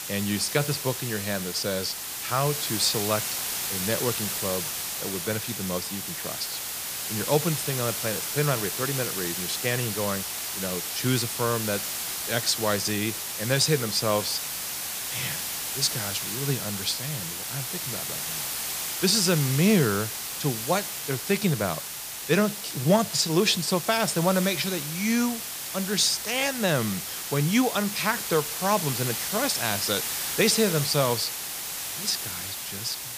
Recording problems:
hiss; loud; throughout; 3 dB below the speech

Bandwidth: 15 kHz